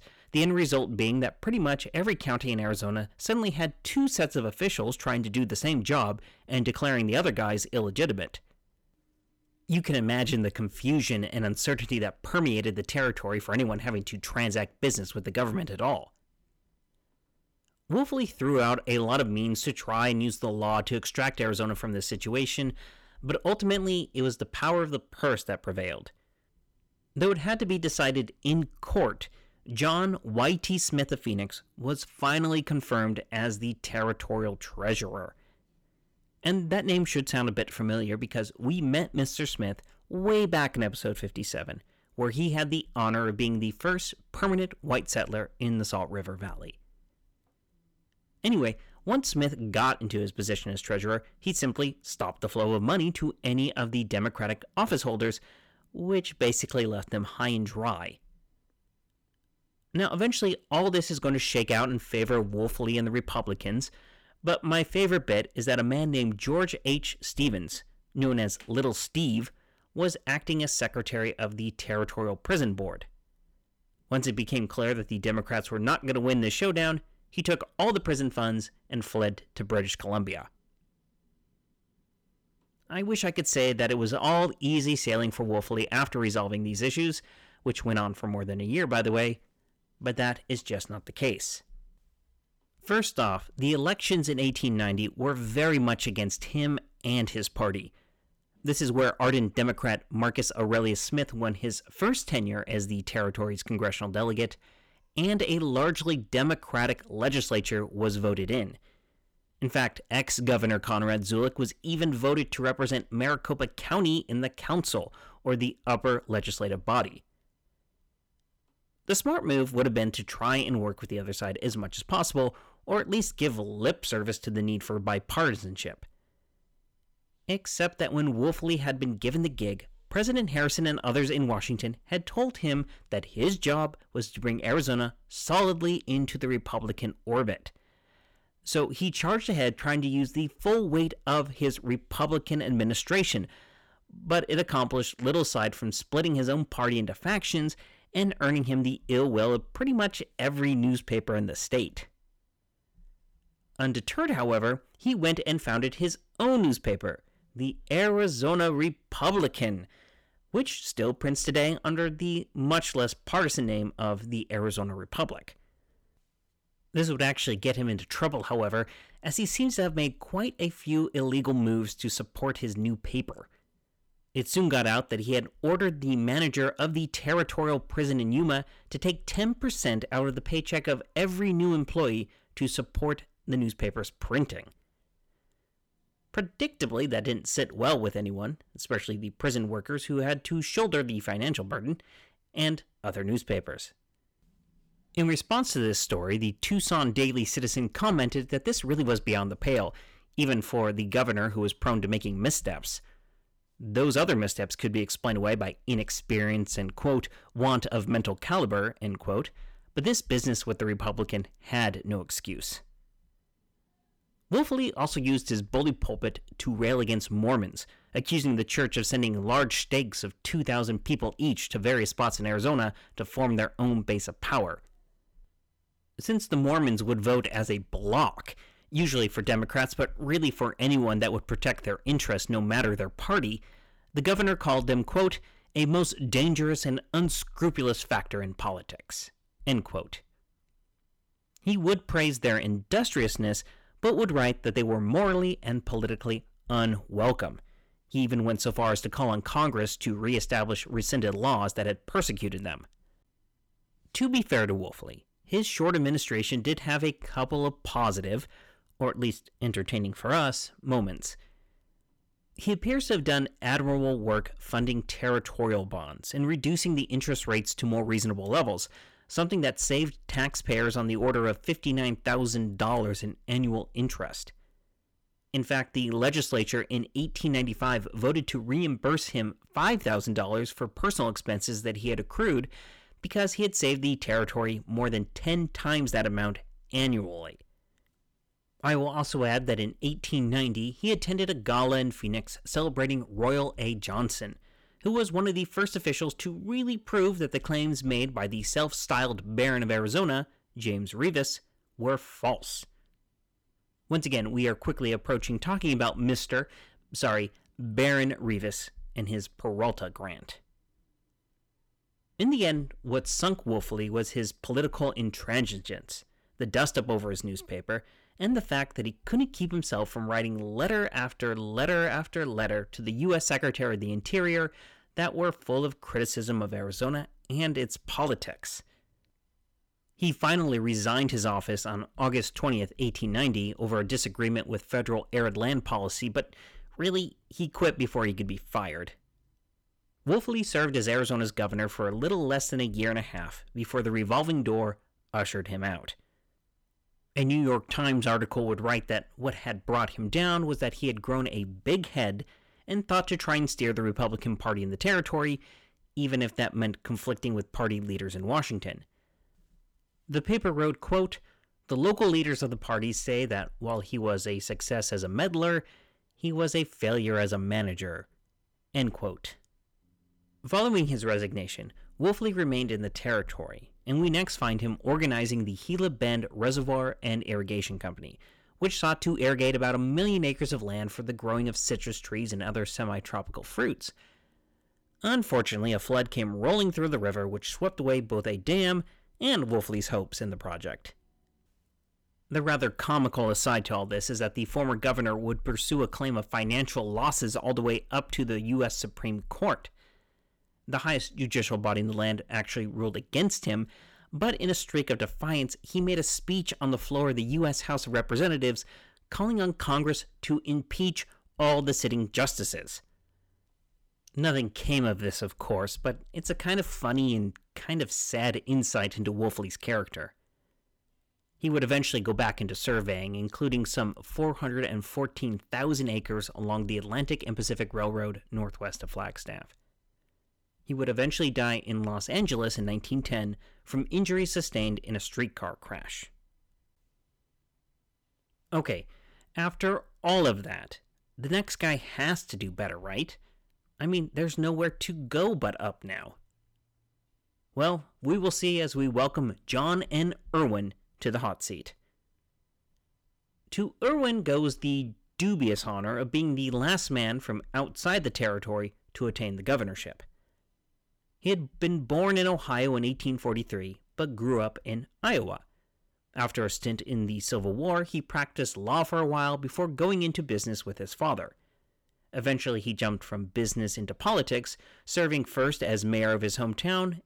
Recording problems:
distortion; slight; 10 dB below the speech

